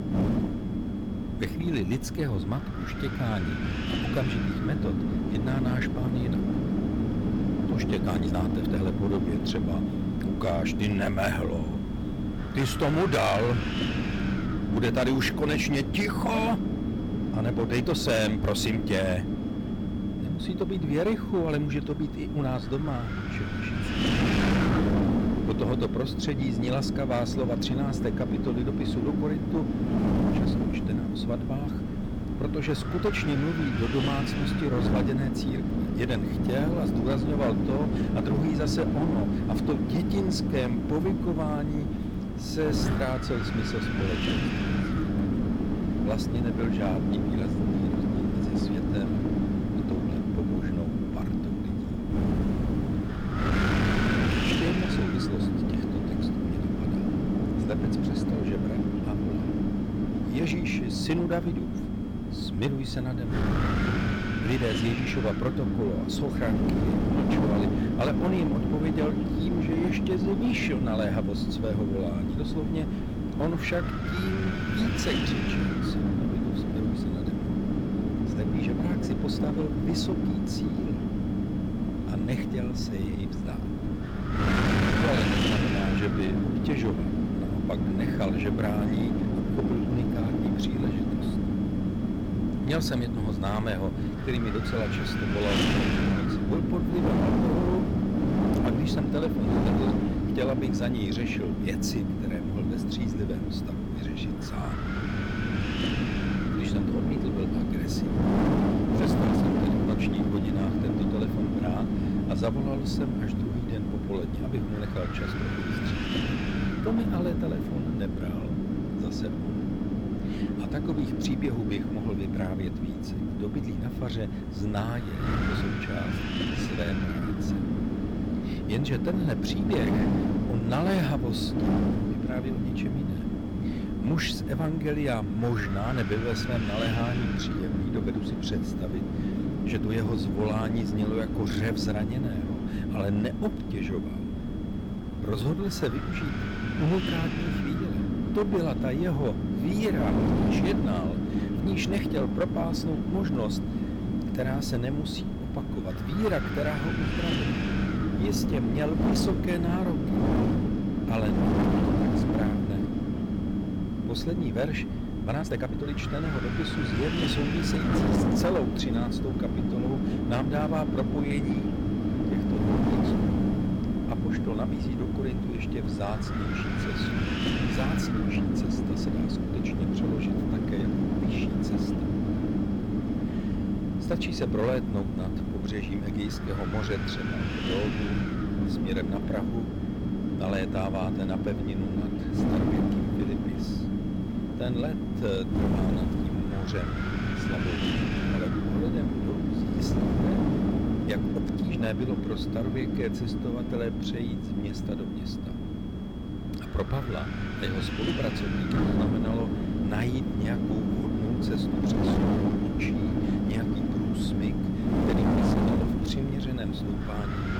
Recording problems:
distortion; slight; 9% of the sound clipped
wind noise on the microphone; heavy; 1 dB above the speech
high-pitched whine; faint; throughout; 3.5 kHz, 25 dB below the speech
uneven, jittery; strongly; from 8 s to 3:33

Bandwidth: 17.5 kHz